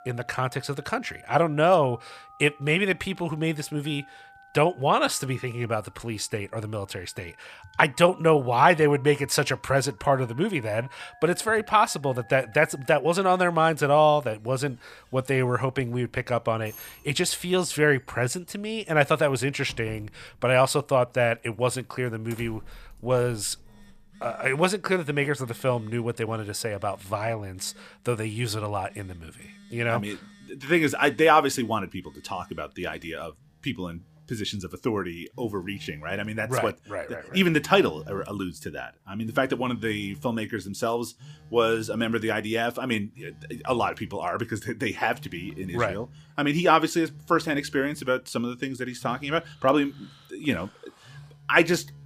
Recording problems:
alarms or sirens; faint; throughout; 25 dB below the speech

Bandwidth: 15 kHz